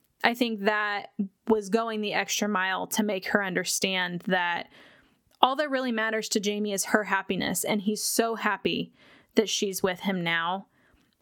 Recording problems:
squashed, flat; somewhat

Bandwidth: 18 kHz